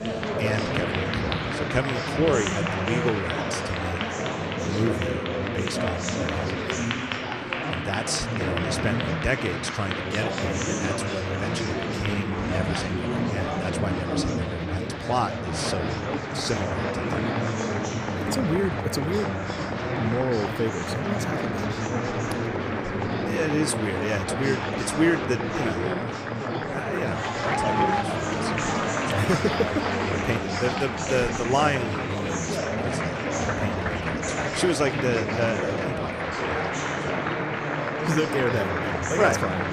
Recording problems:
murmuring crowd; very loud; throughout; 2 dB above the speech

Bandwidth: 15.5 kHz